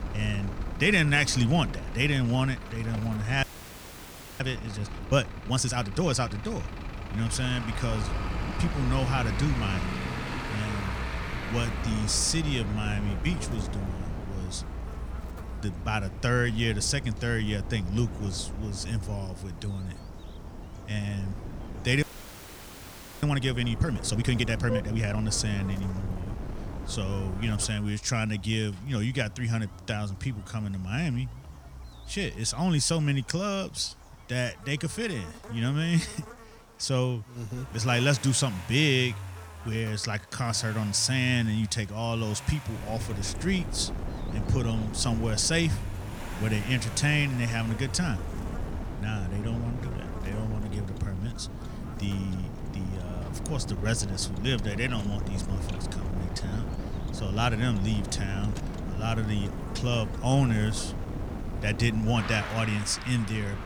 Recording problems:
traffic noise; noticeable; throughout; 10 dB below the speech
wind noise on the microphone; occasional gusts; until 28 s and from 43 s on; 15 dB below the speech
electrical hum; faint; throughout; 60 Hz, 20 dB below the speech
audio freezing; at 3.5 s for 1 s and at 22 s for 1 s

